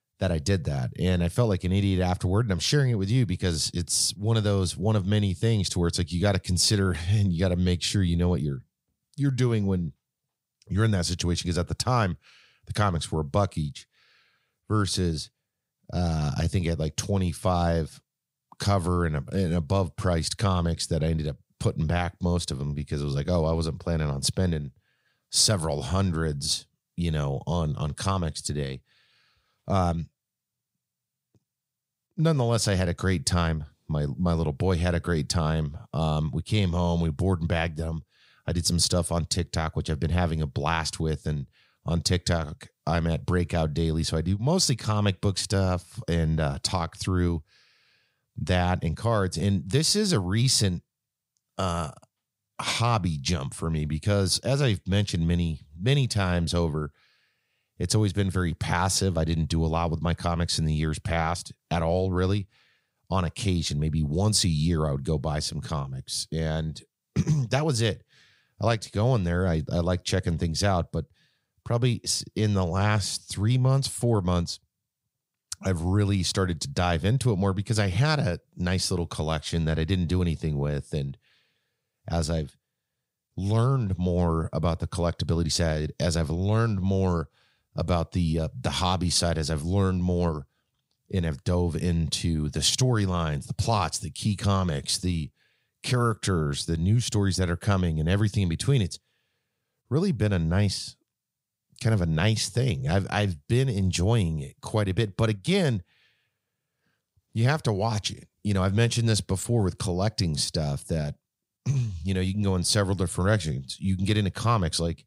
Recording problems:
none

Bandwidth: 15.5 kHz